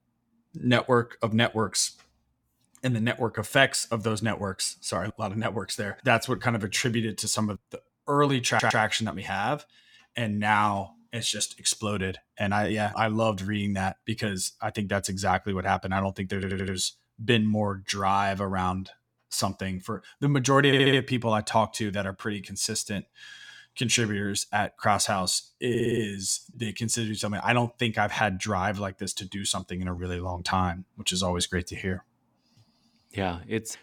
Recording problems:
audio stuttering; 4 times, first at 8.5 s

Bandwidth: 18.5 kHz